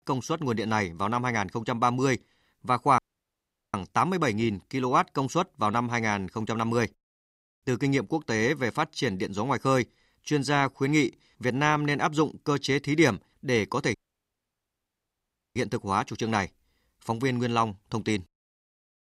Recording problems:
audio cutting out; at 3 s for 1 s and at 14 s for 1.5 s

